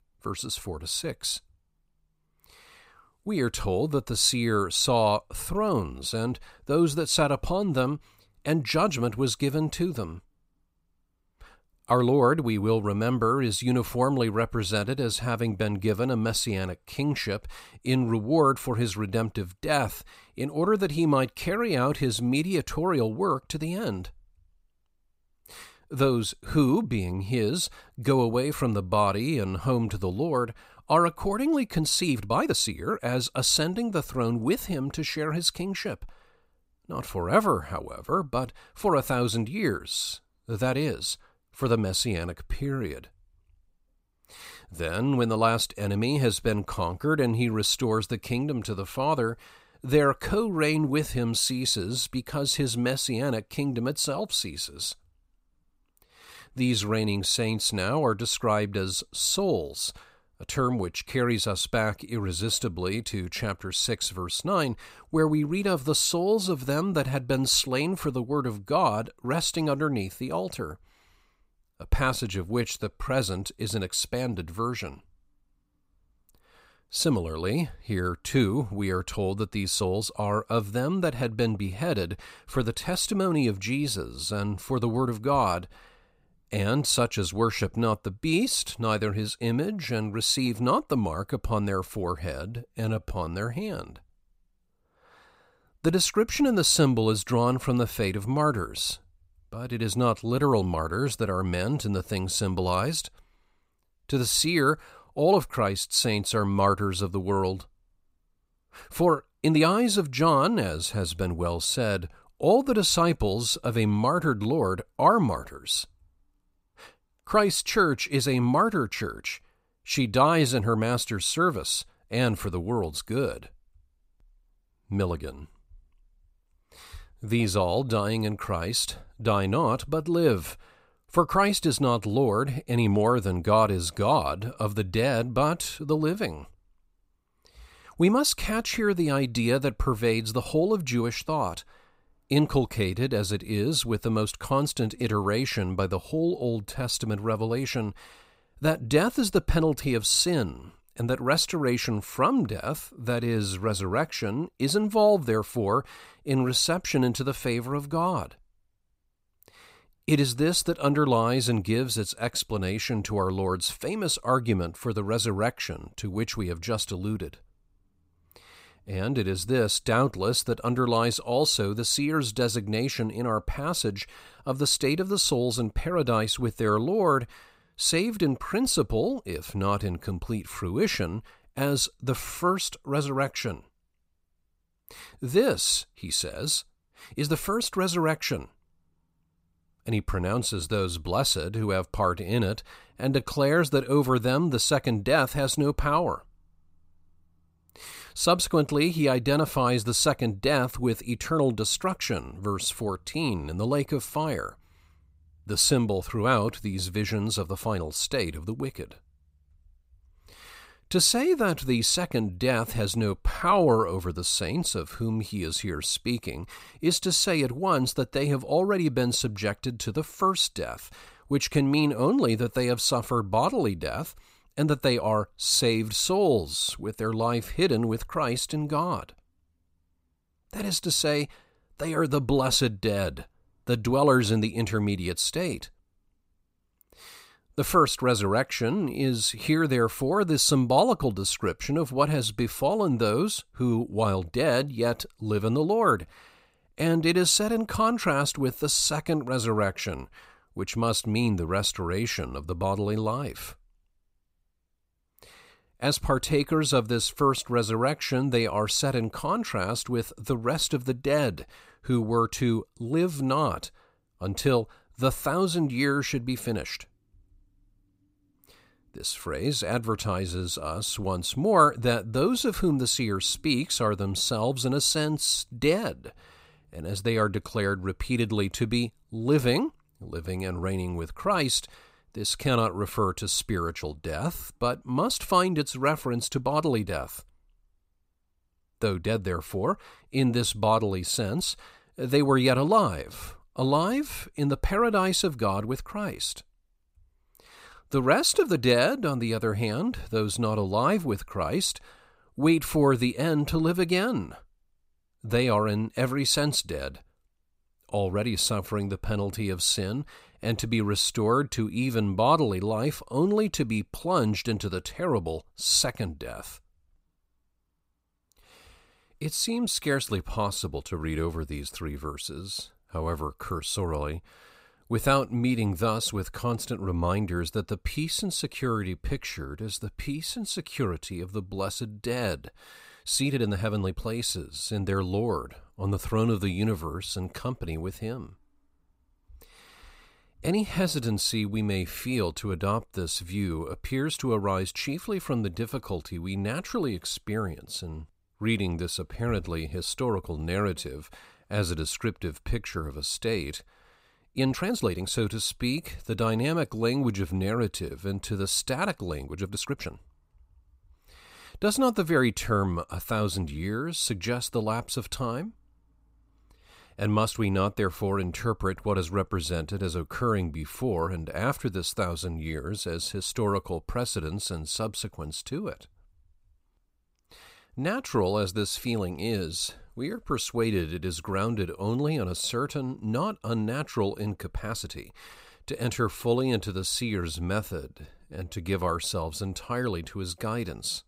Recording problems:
uneven, jittery; strongly; from 32 s to 6:29

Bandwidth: 15.5 kHz